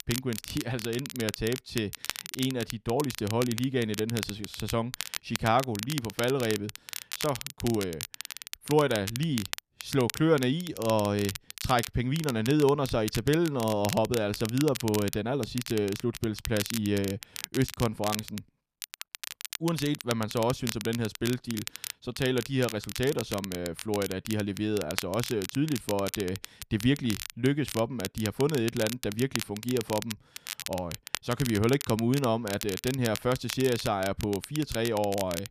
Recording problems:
crackle, like an old record; loud; 8 dB below the speech

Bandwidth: 14.5 kHz